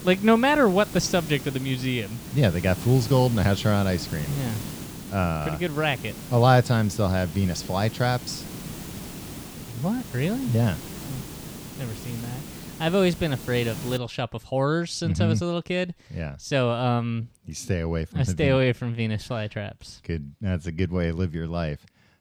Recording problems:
hiss; noticeable; until 14 s; 10 dB below the speech

